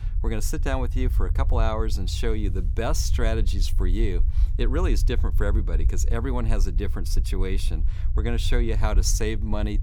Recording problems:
low rumble; noticeable; throughout; 15 dB below the speech

